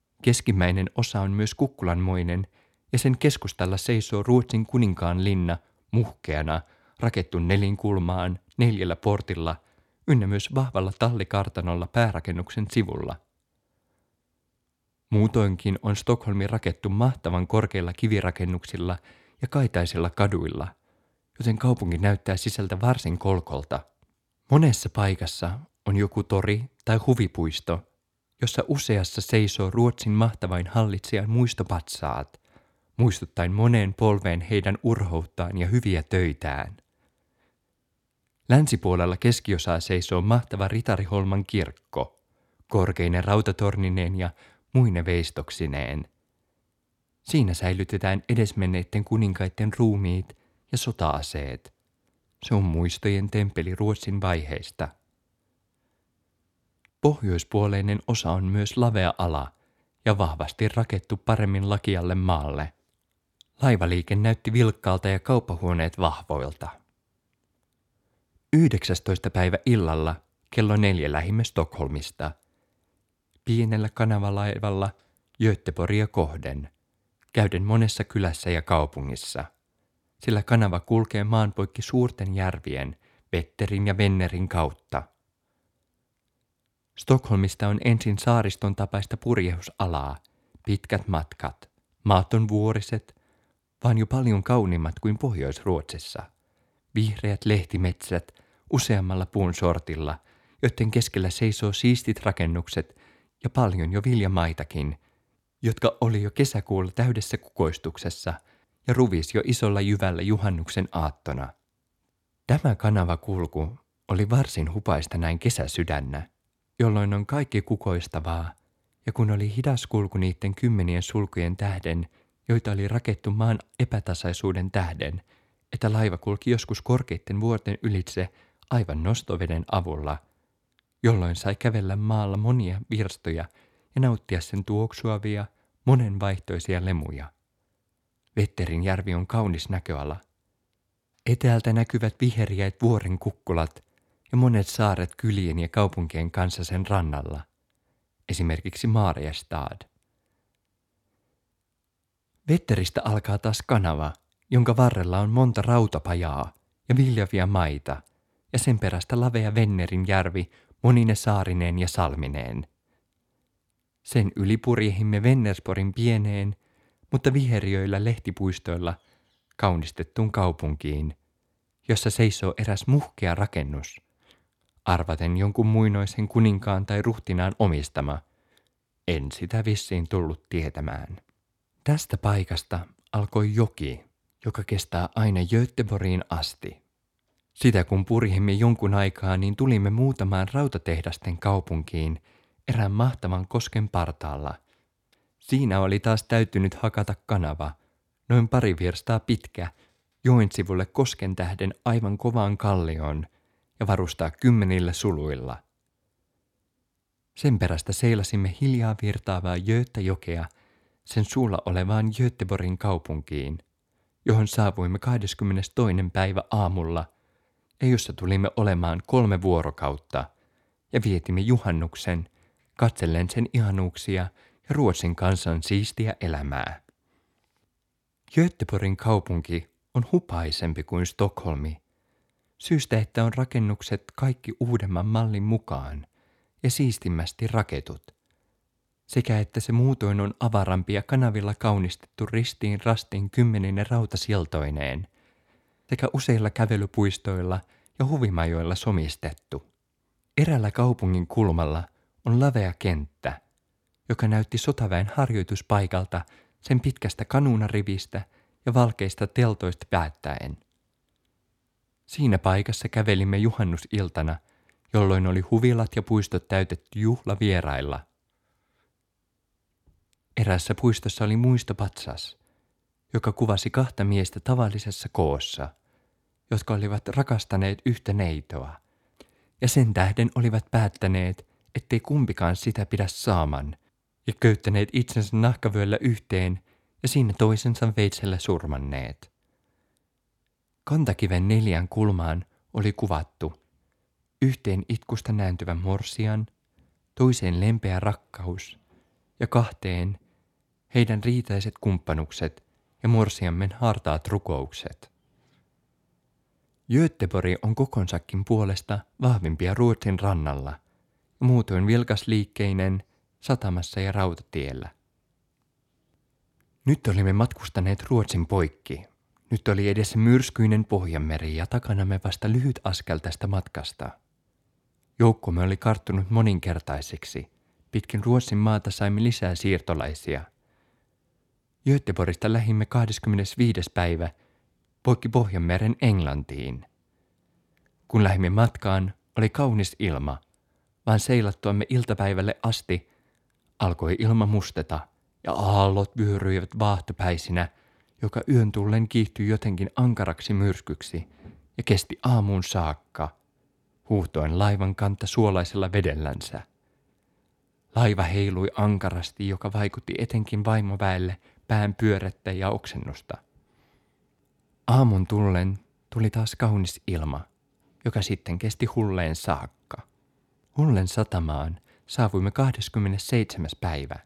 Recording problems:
none

